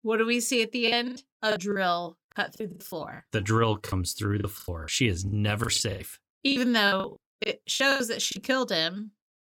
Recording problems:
choppy; very; from 1 to 4 s and from 4.5 to 8.5 s; 19% of the speech affected

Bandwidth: 17 kHz